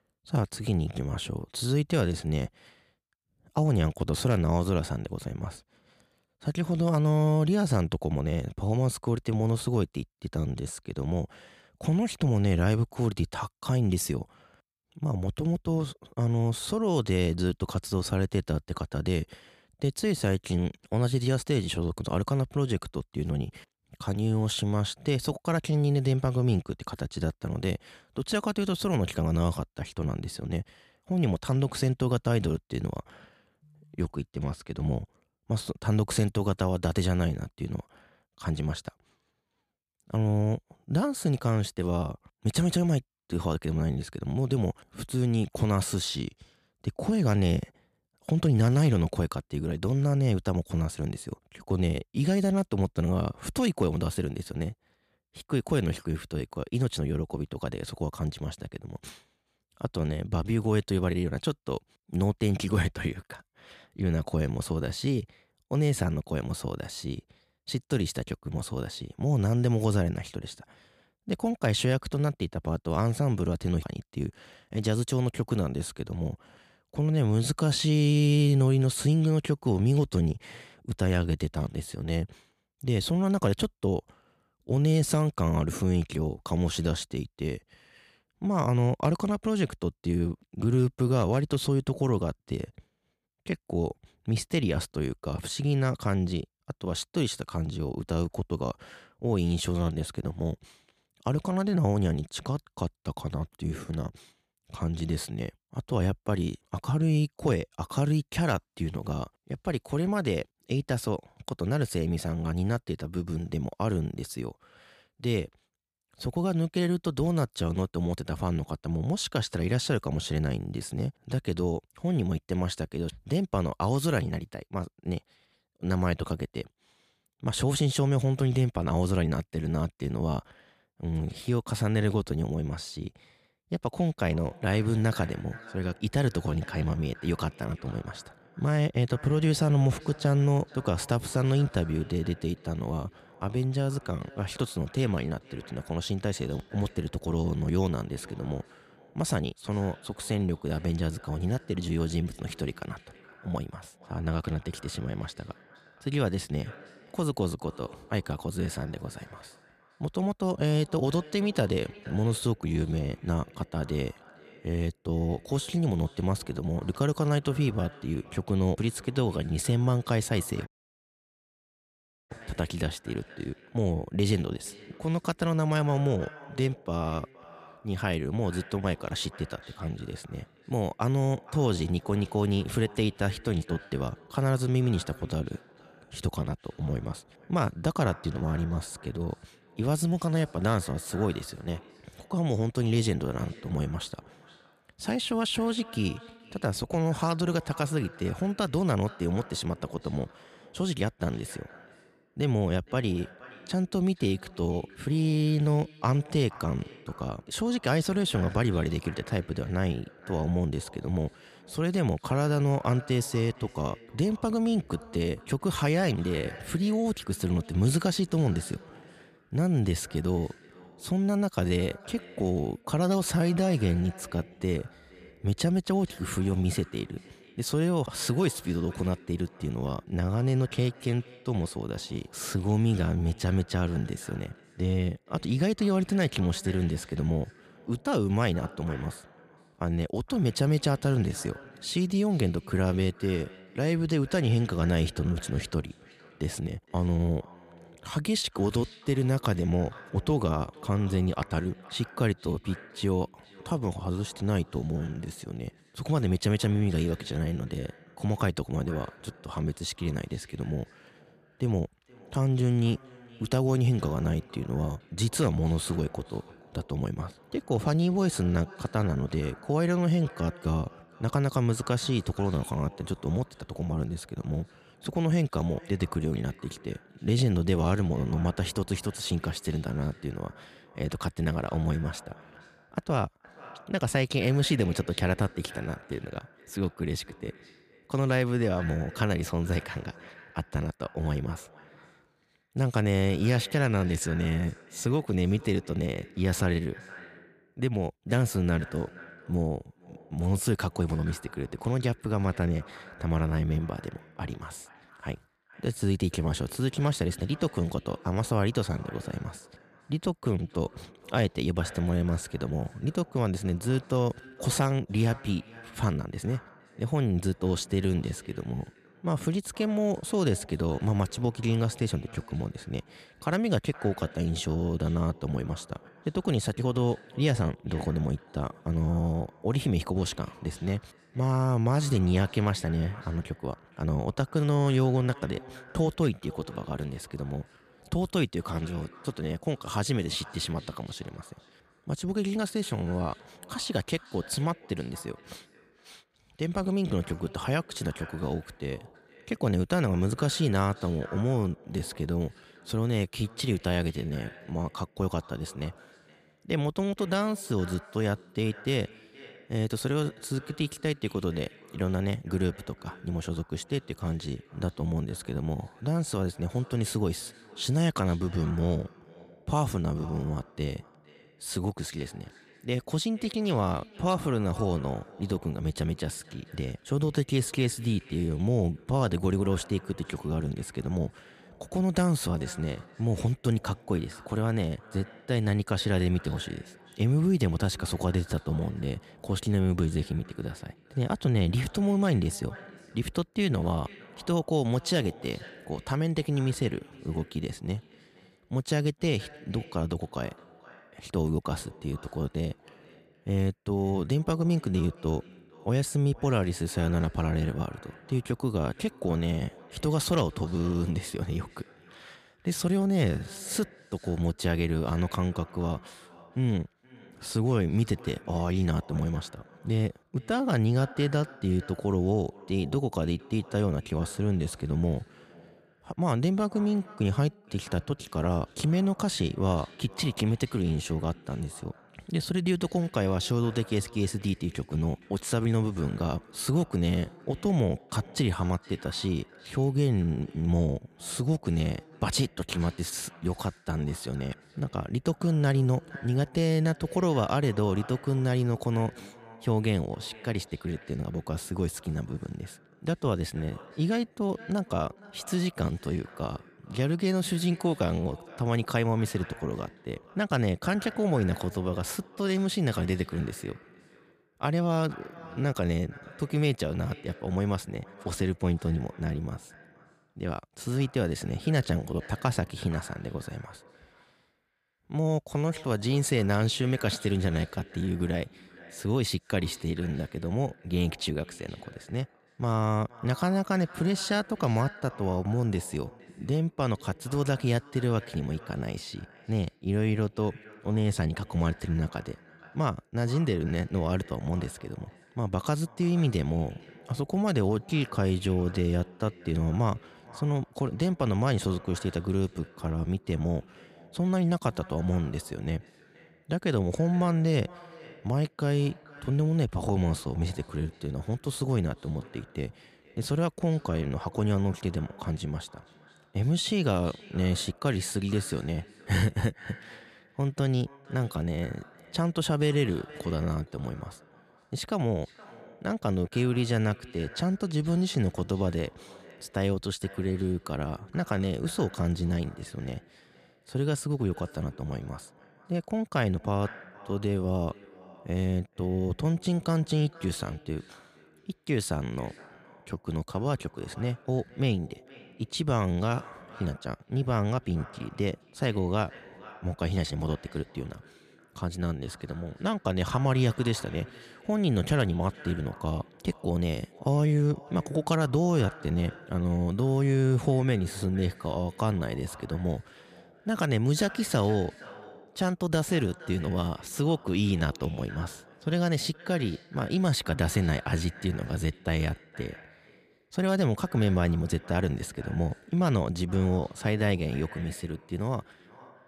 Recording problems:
echo of what is said; faint; from 2:14 on; 470 ms later, 20 dB below the speech
audio cutting out; at 2:51 for 1.5 s

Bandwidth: 14.5 kHz